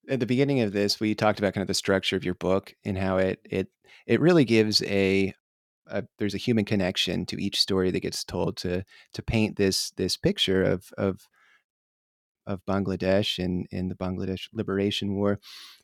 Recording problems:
none

